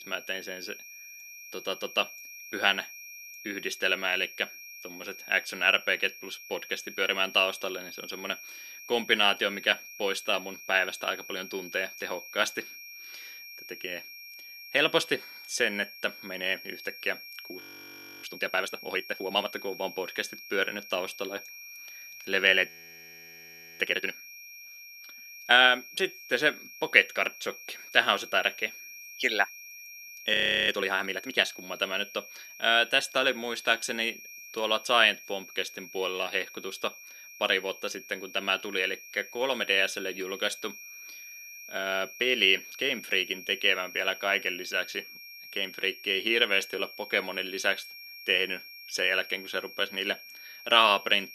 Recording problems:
thin; somewhat; fading below 250 Hz
high-pitched whine; noticeable; throughout; 2.5 kHz, 15 dB below the speech
audio freezing; at 18 s for 0.5 s, at 23 s for 1 s and at 30 s

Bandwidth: 13.5 kHz